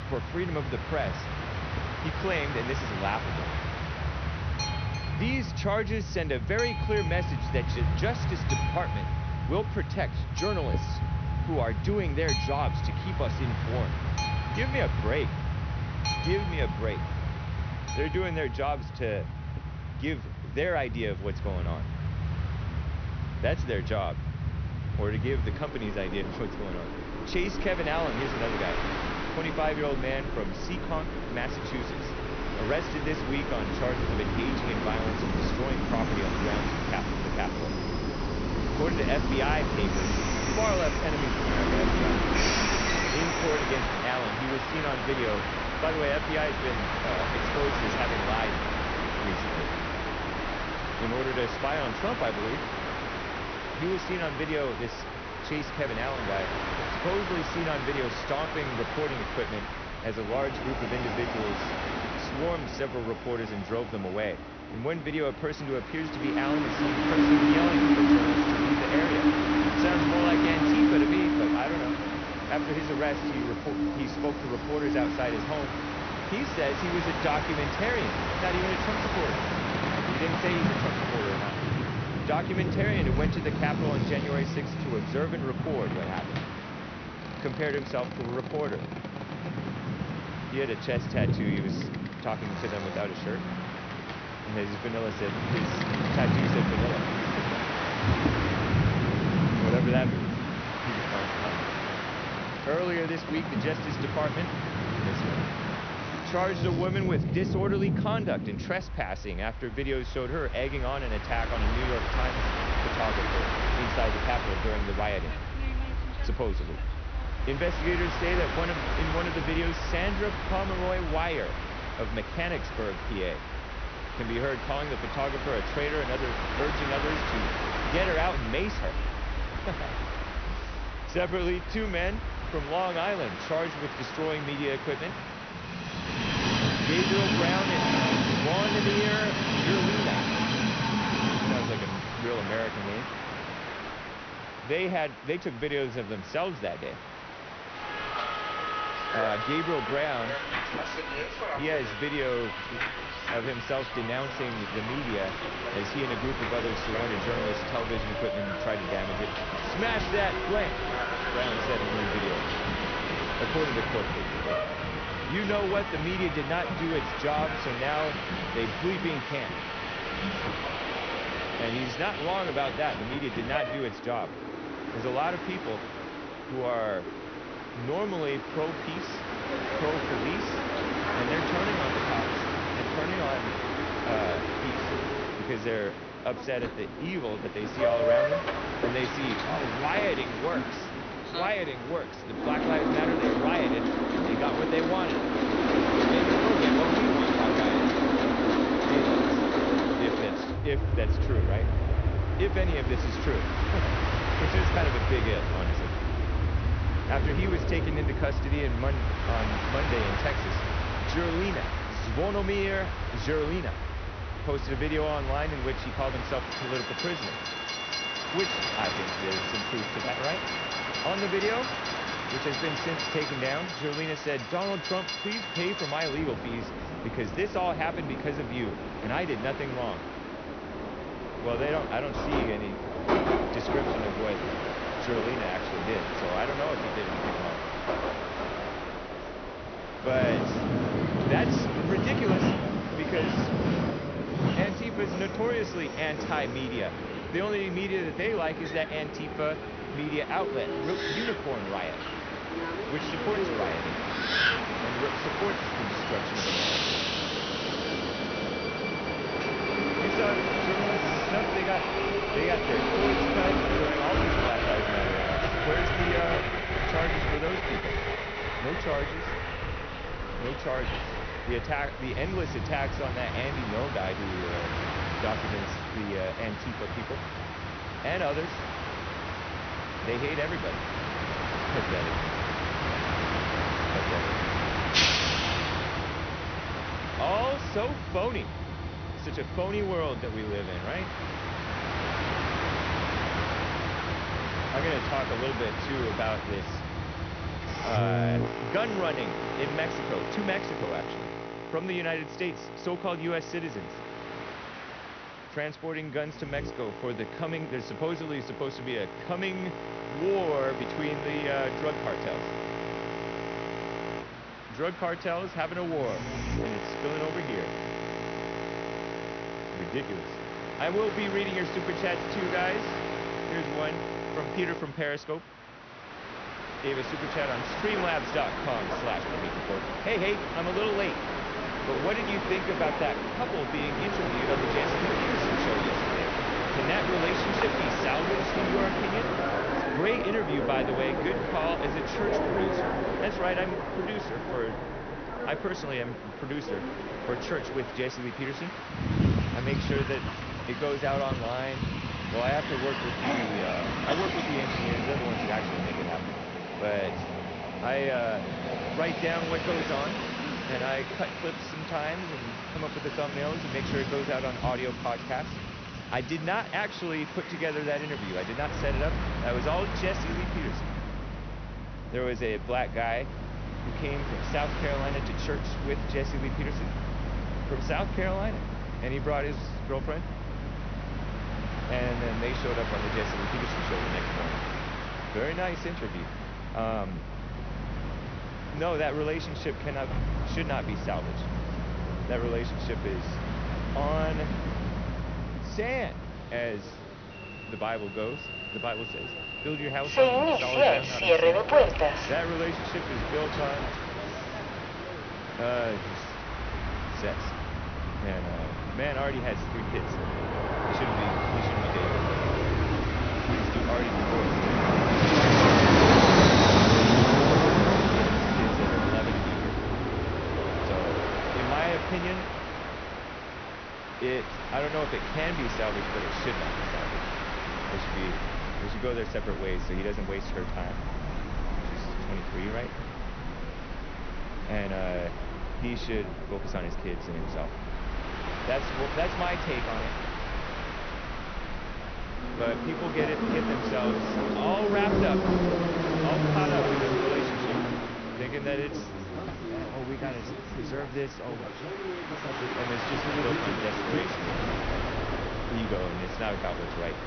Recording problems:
high frequencies cut off; noticeable; nothing above 6 kHz
train or aircraft noise; very loud; throughout; 3 dB above the speech

